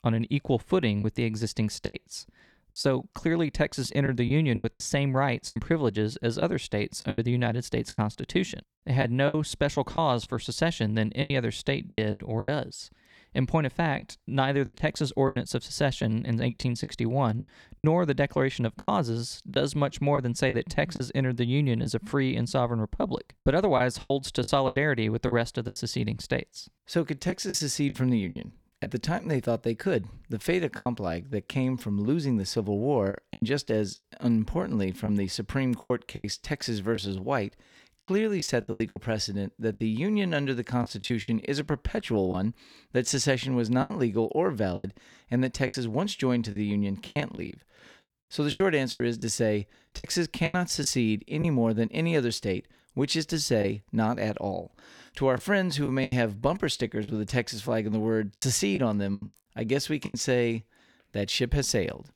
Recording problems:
choppy; very; 8% of the speech affected

